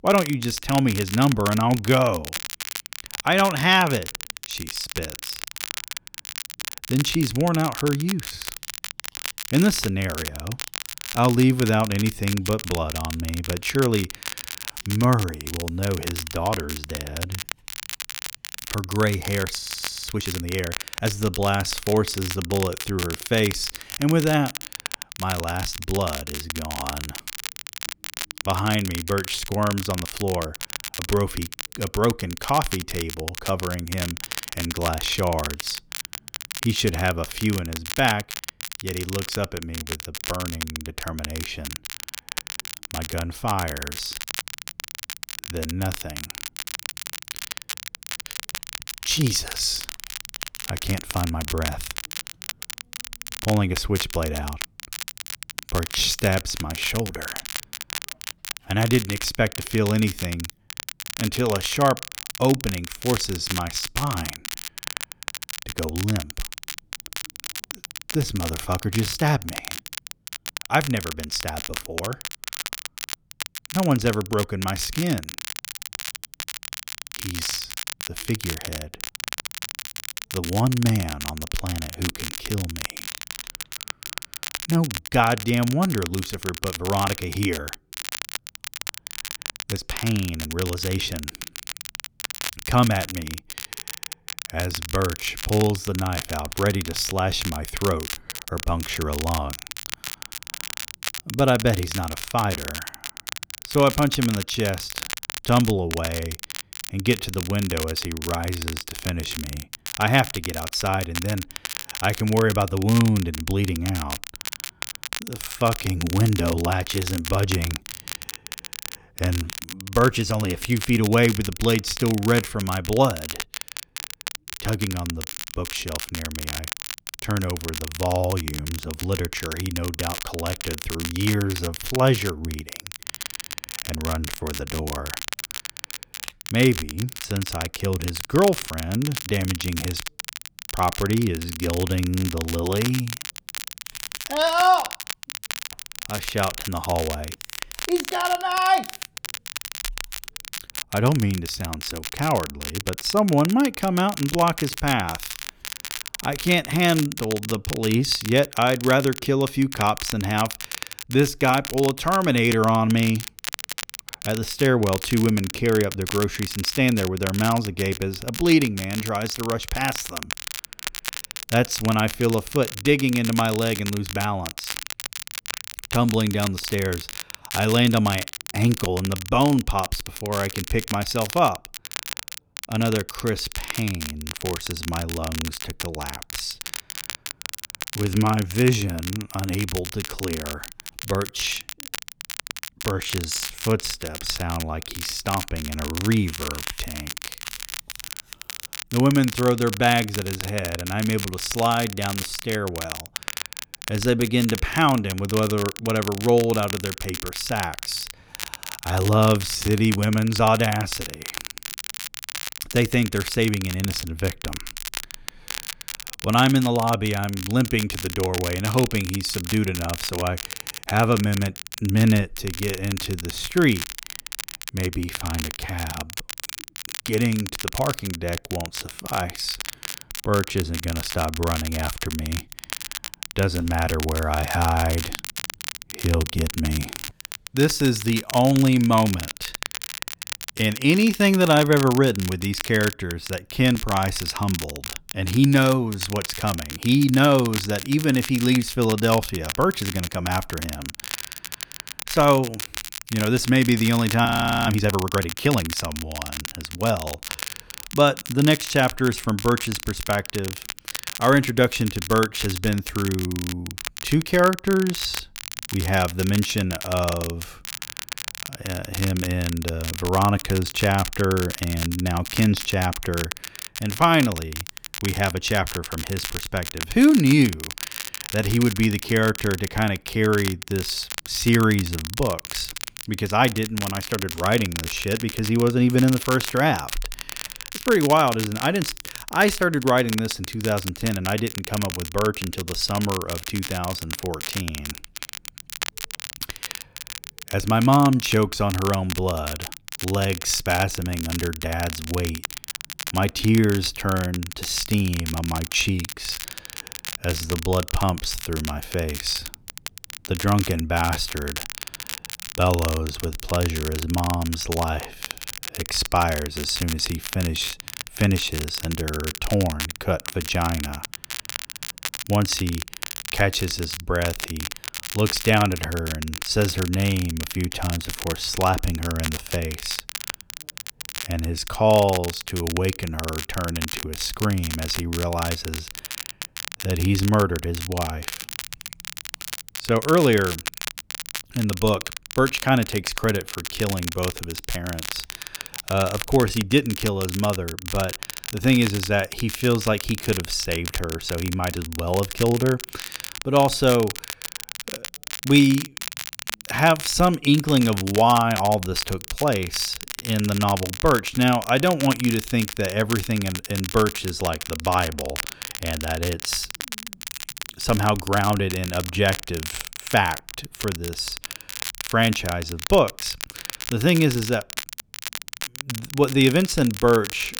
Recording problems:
crackle, like an old record; loud; 9 dB below the speech
audio freezing; at 20 s and at 4:14

